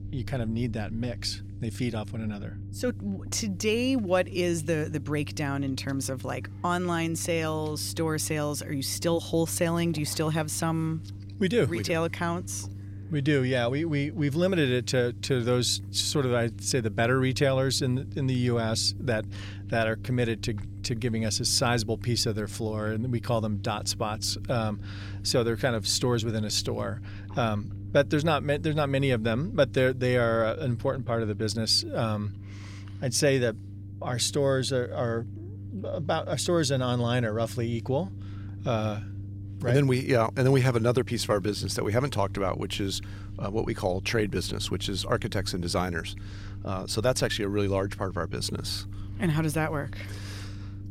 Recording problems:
low rumble; faint; throughout; 25 dB below the speech

